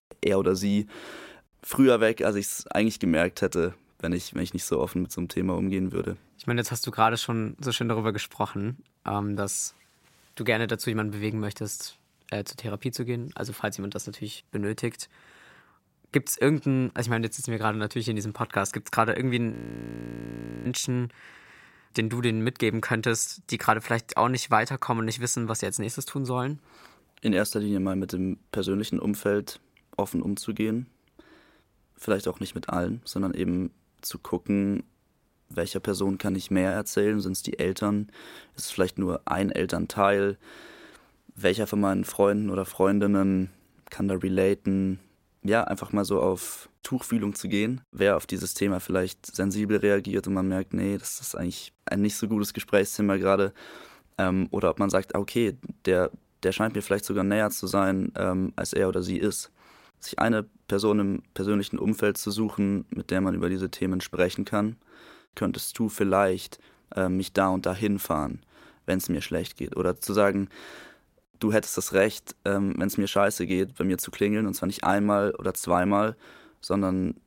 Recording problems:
audio freezing; at 20 s for 1 s

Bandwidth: 16 kHz